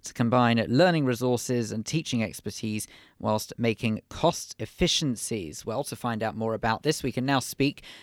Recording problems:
none

